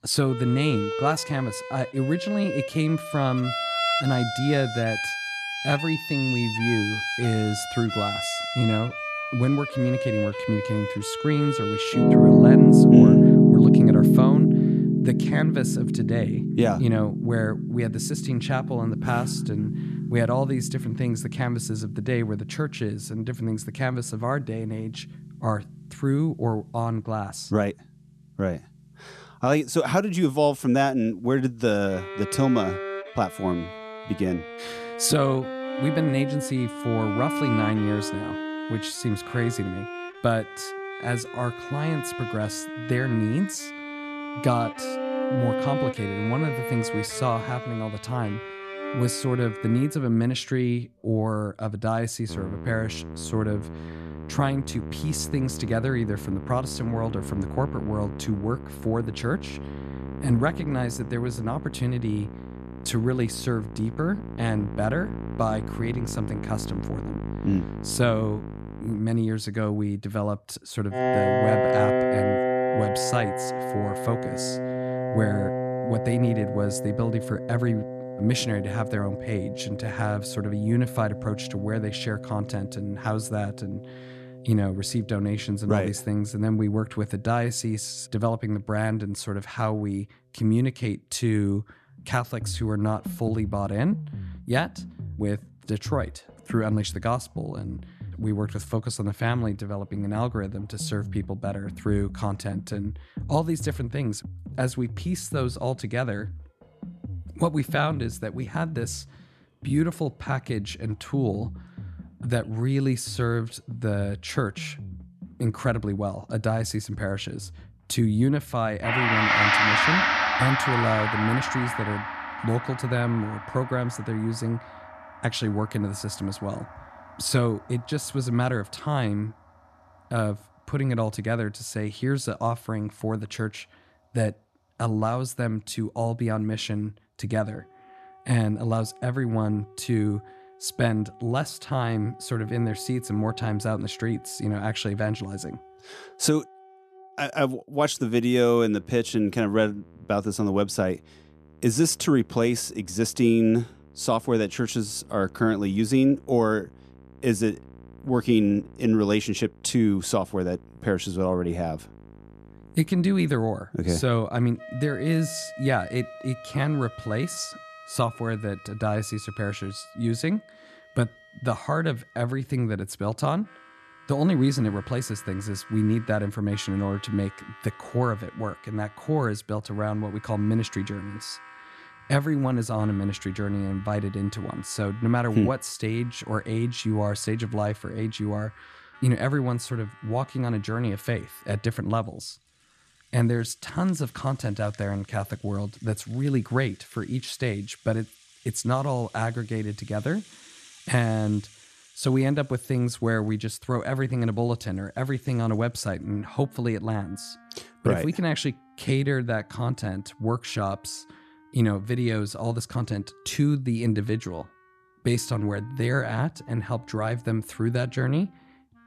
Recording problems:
background music; very loud; throughout; as loud as the speech

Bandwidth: 13.5 kHz